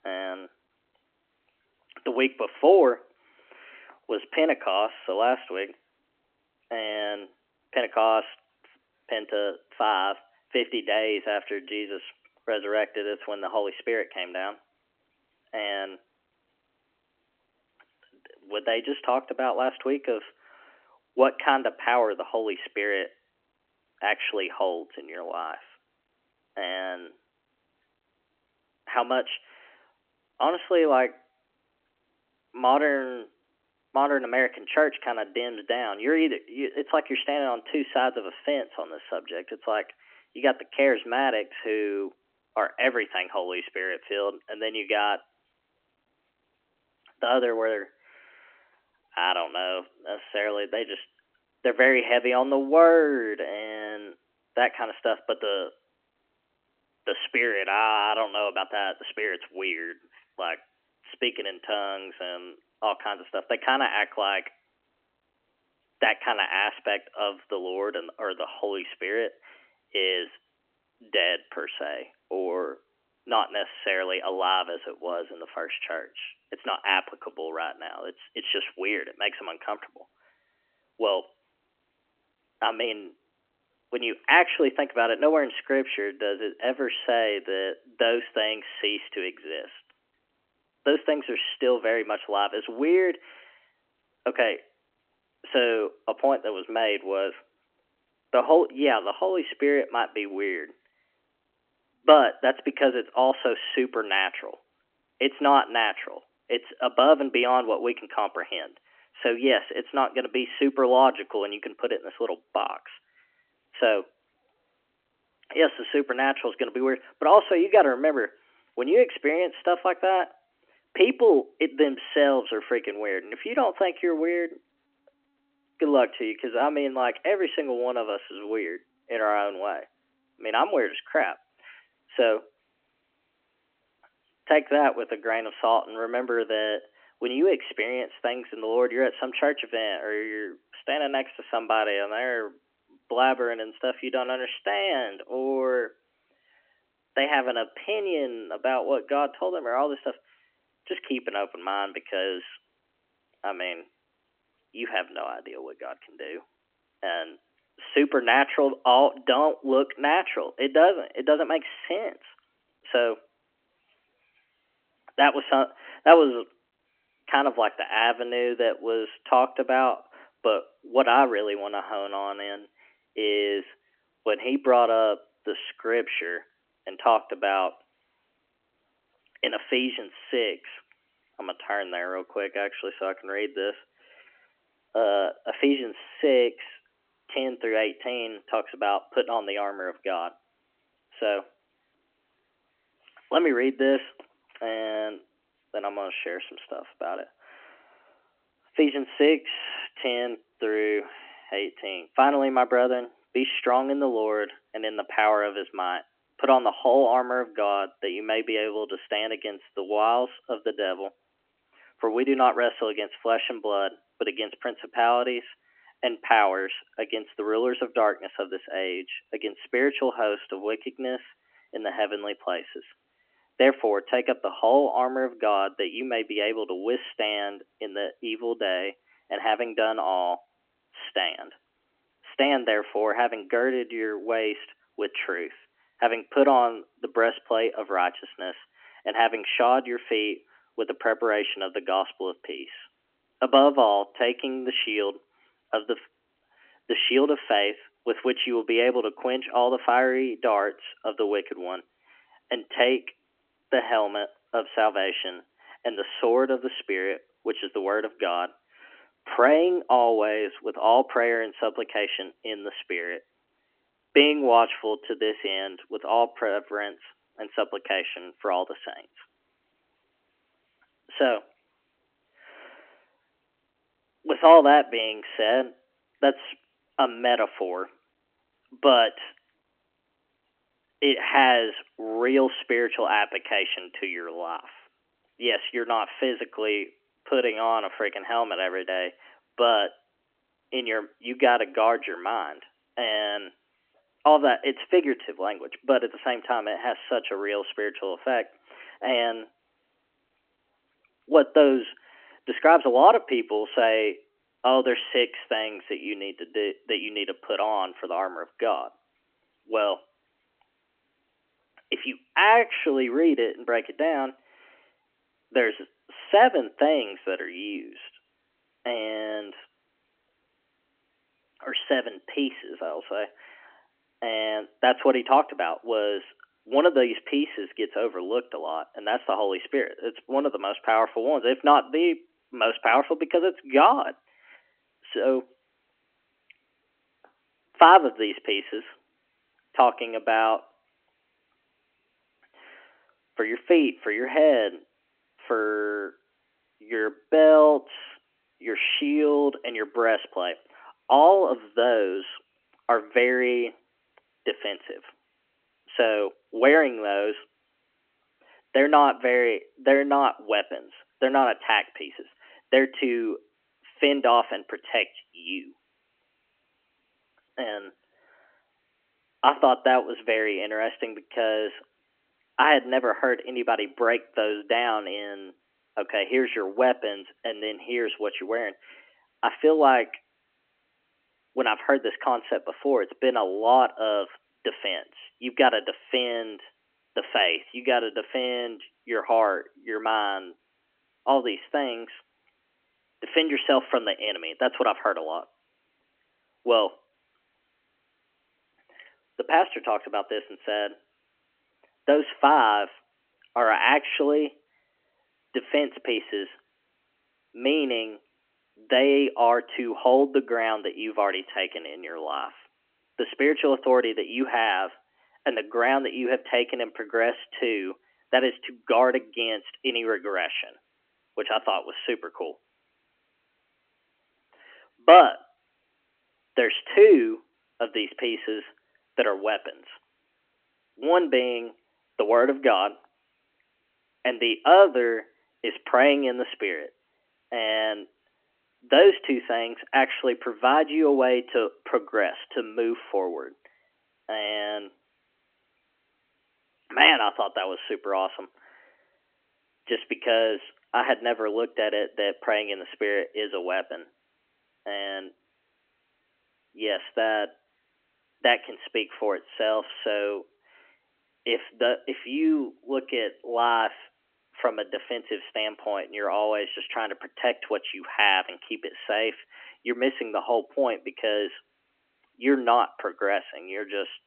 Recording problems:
phone-call audio; nothing above 3 kHz

